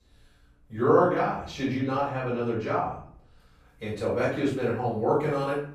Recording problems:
off-mic speech; far
room echo; noticeable; dies away in 0.5 s

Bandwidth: 15 kHz